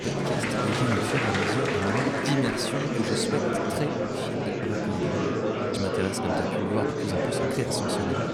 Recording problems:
murmuring crowd; very loud; throughout; 5 dB above the speech

